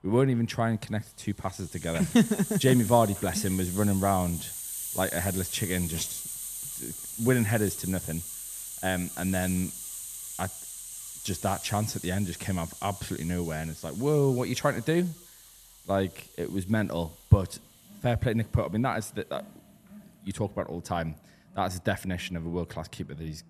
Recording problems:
hiss; loud; throughout; 8 dB below the speech
animal sounds; faint; throughout; 30 dB below the speech

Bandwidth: 14 kHz